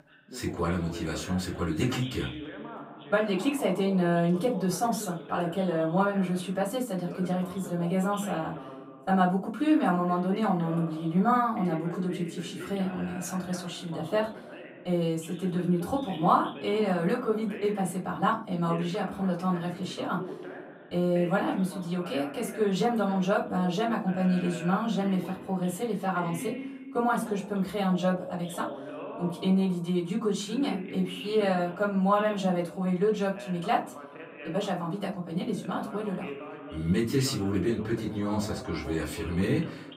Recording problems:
off-mic speech; far
room echo; very slight; dies away in 0.3 s
voice in the background; noticeable; throughout; 15 dB below the speech

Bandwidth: 15.5 kHz